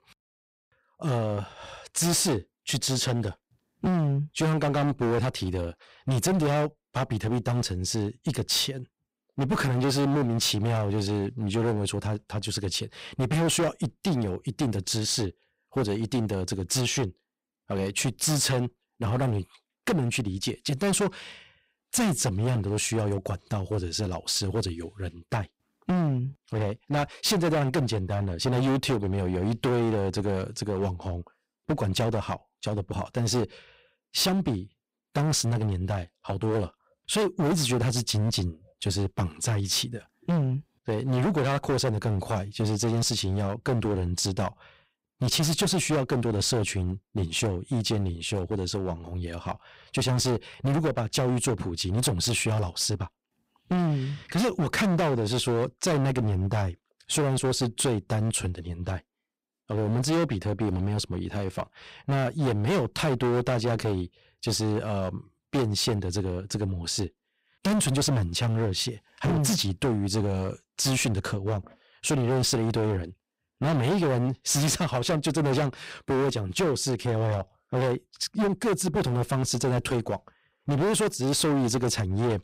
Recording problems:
distortion; heavy; 17% of the sound clipped

